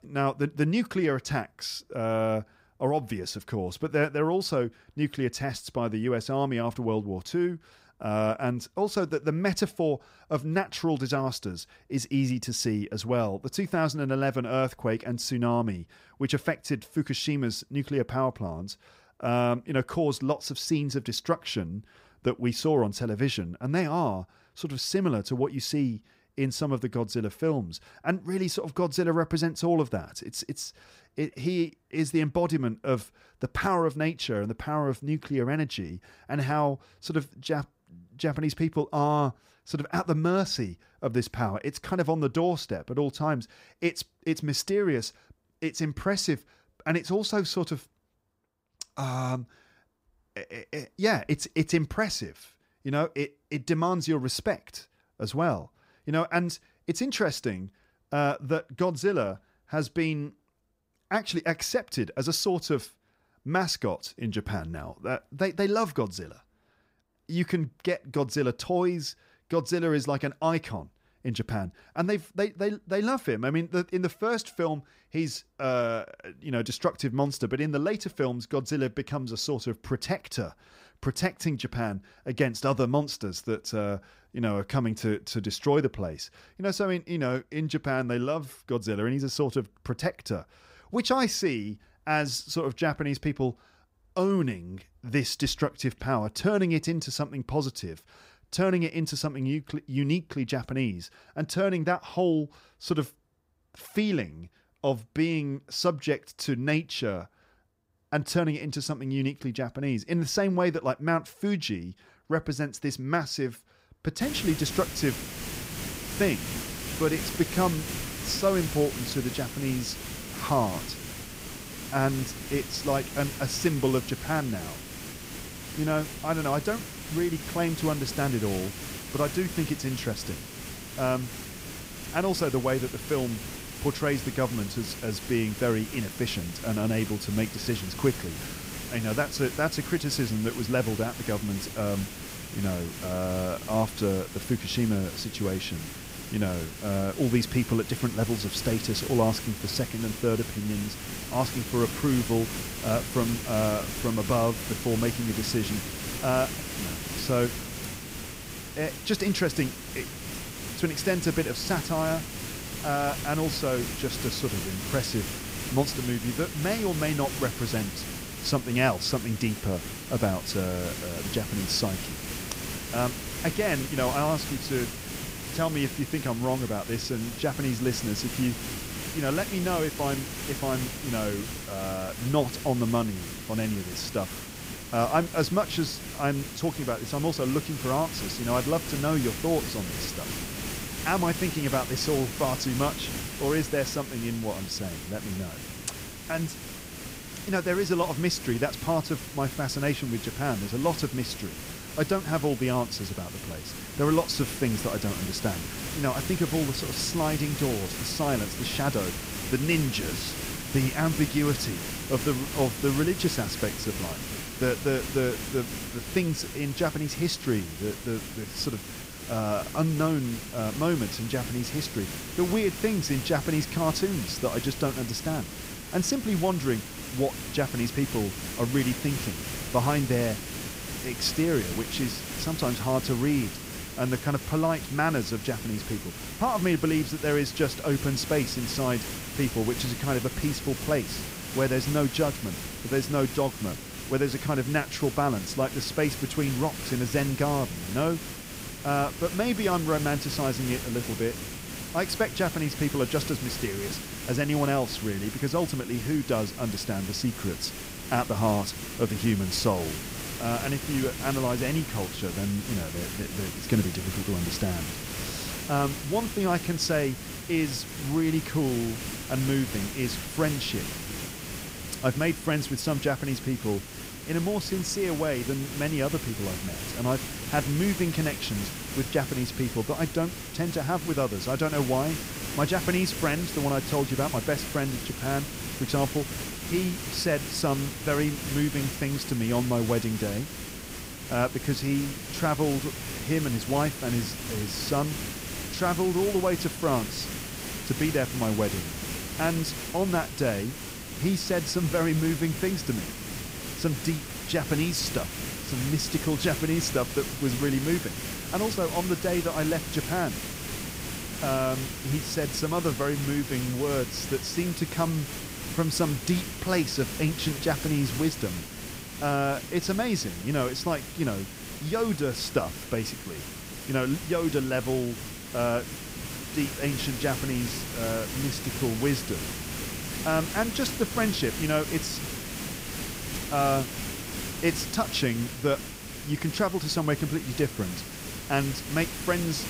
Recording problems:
hiss; loud; from 1:54 on; 6 dB below the speech

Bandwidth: 15.5 kHz